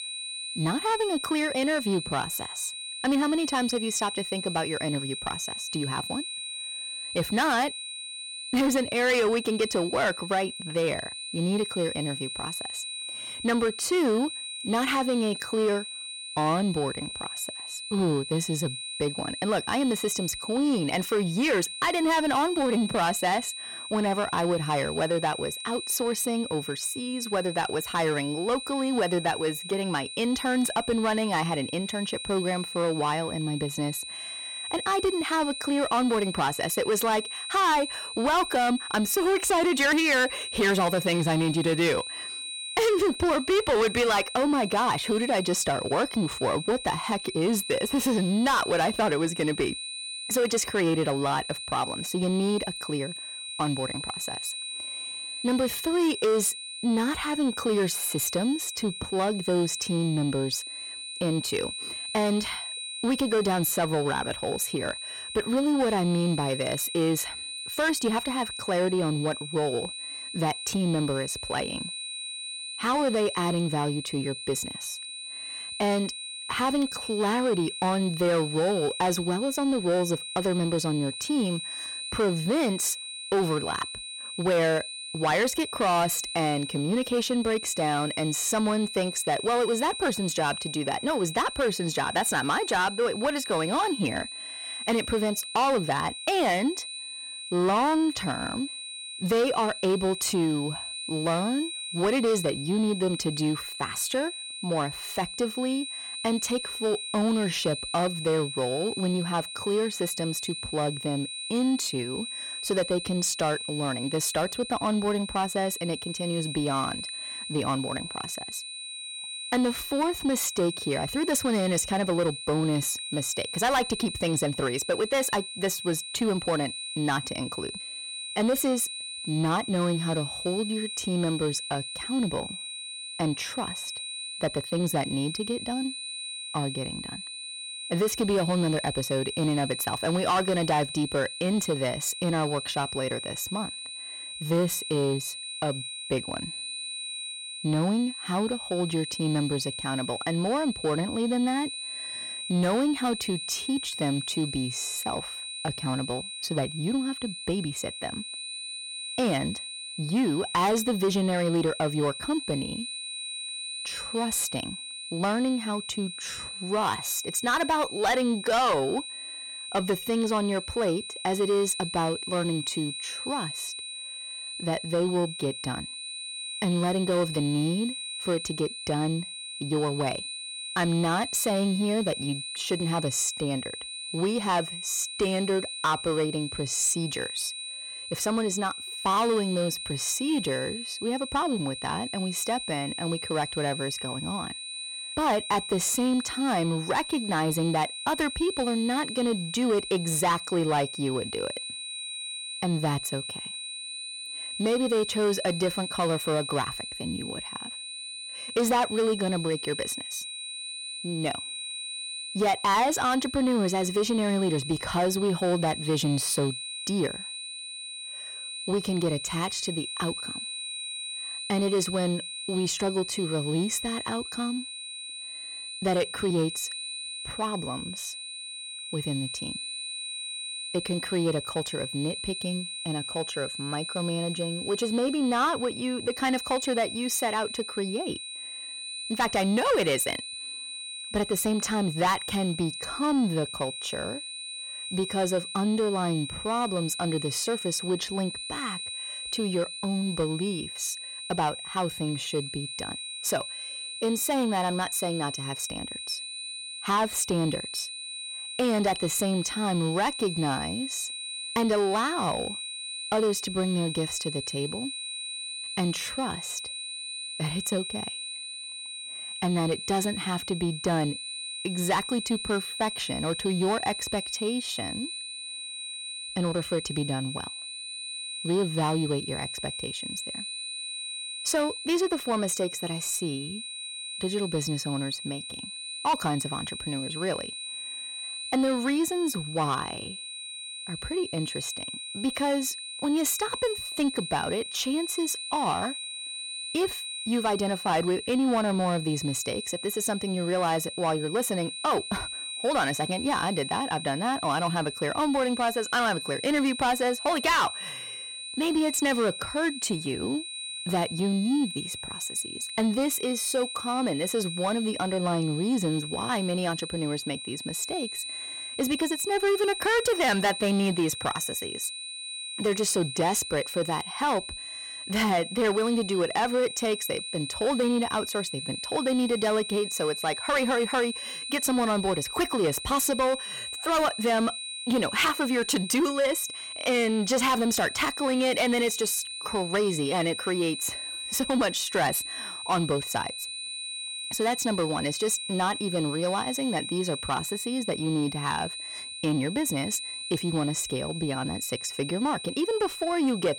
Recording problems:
distortion; slight; 10 dB below the speech
high-pitched whine; loud; throughout; 4 kHz, 7 dB below the speech

